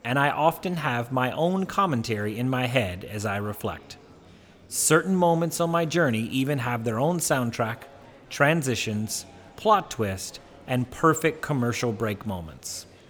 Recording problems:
murmuring crowd; faint; throughout; 25 dB below the speech

